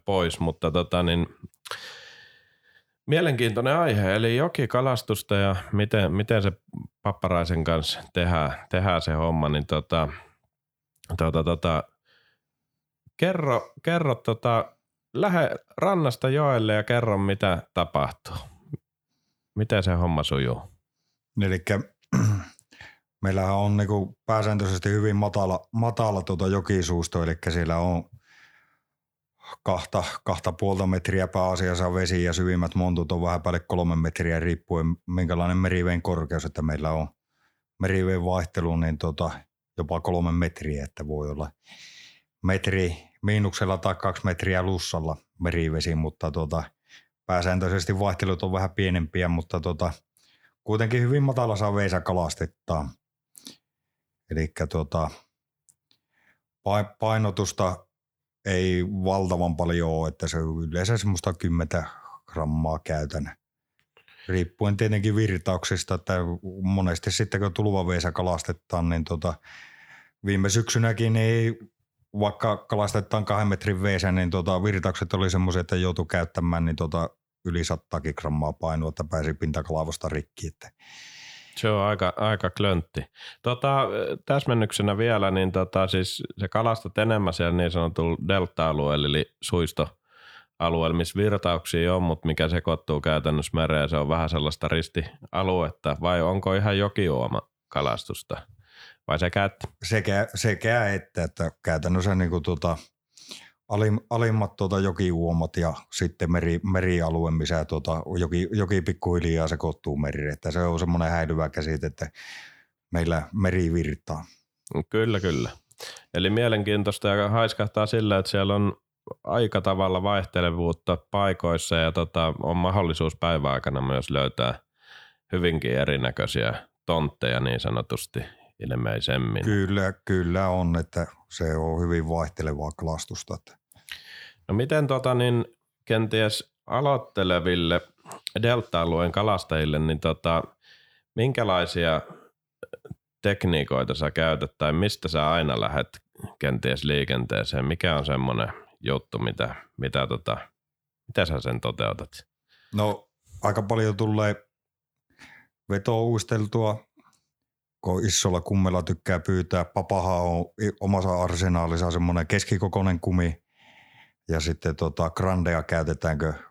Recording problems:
none

